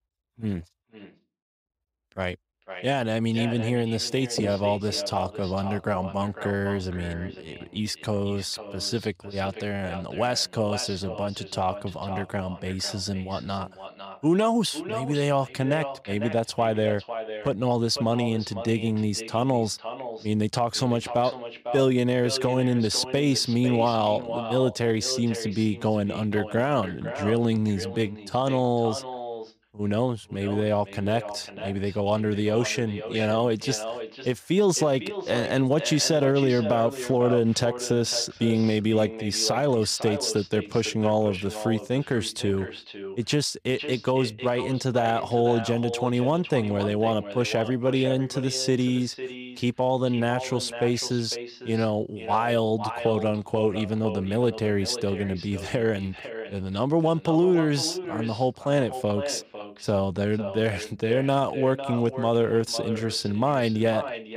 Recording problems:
echo of what is said; strong; throughout; 500 ms later, 10 dB below the speech

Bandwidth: 15.5 kHz